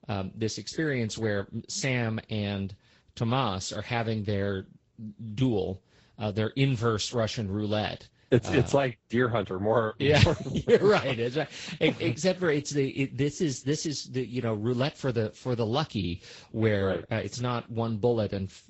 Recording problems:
high frequencies cut off; noticeable; nothing above 8 kHz
garbled, watery; slightly

